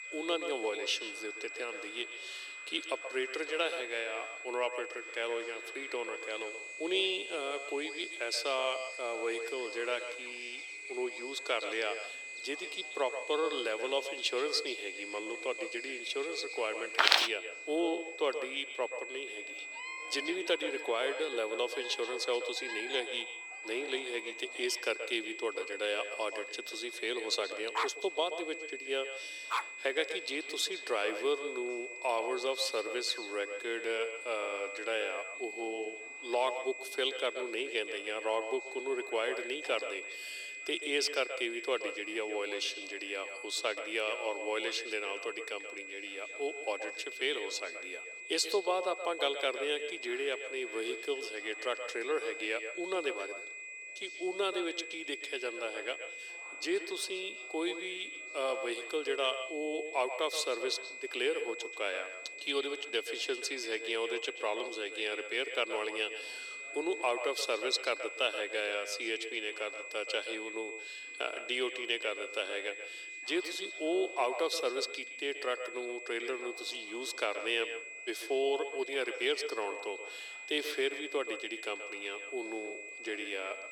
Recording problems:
echo of what is said; strong; throughout; 130 ms later, 10 dB below the speech
thin; very; fading below 350 Hz
high-pitched whine; loud; throughout; 2.5 kHz, 7 dB below the speech
animal sounds; noticeable; until 40 s; 15 dB below the speech
background chatter; faint; throughout; 3 voices, 25 dB below the speech
footsteps; loud; at 17 s; peak 10 dB above the speech
dog barking; noticeable; from 28 to 30 s; peak level with the speech

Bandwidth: 18.5 kHz